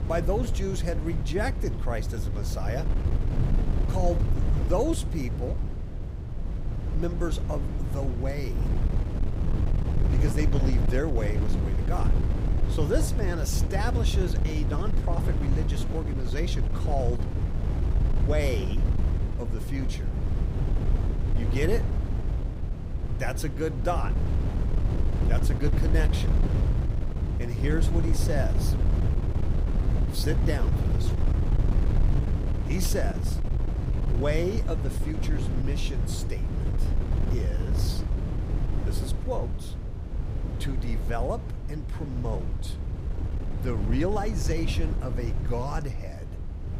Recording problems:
wind noise on the microphone; heavy; 6 dB below the speech

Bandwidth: 15.5 kHz